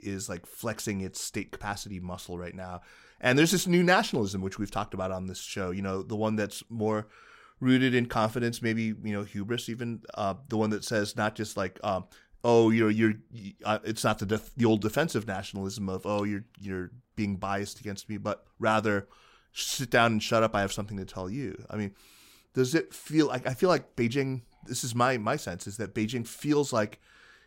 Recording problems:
none

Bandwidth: 16 kHz